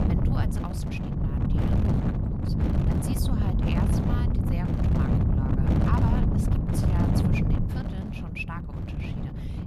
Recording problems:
wind noise on the microphone; heavy; 5 dB above the speech

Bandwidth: 13.5 kHz